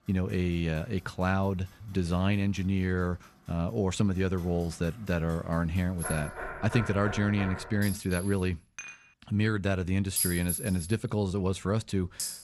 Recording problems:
household noises; loud; throughout; 6 dB below the speech
door banging; noticeable; from 6 to 8 s; peak 8 dB below the speech
clattering dishes; faint; at 9 s; peak 15 dB below the speech

